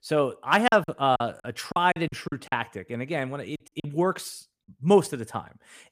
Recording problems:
choppy; very; from 0.5 to 2.5 s and at 3.5 s; 17% of the speech affected

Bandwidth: 15 kHz